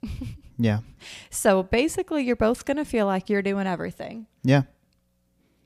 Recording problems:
none

